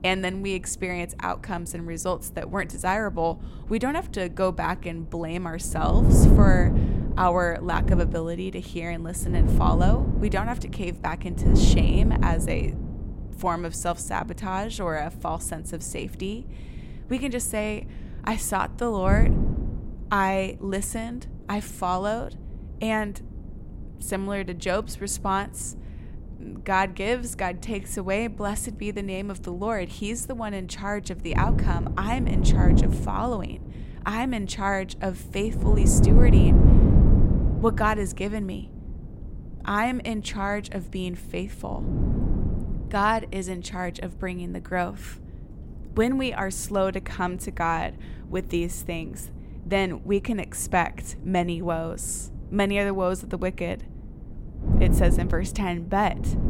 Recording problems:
wind noise on the microphone; heavy; 5 dB below the speech

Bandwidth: 16 kHz